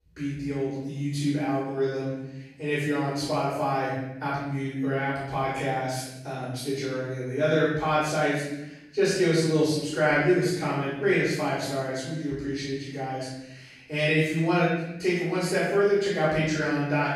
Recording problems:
room echo; strong; dies away in 0.9 s
off-mic speech; far

